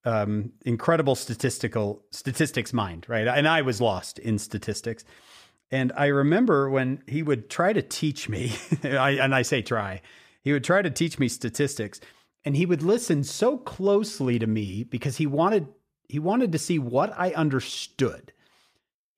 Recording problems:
none

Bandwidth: 15 kHz